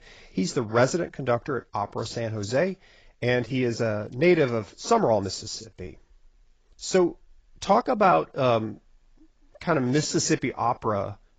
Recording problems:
garbled, watery; badly; nothing above 7.5 kHz
uneven, jittery; strongly; from 1.5 to 10 s

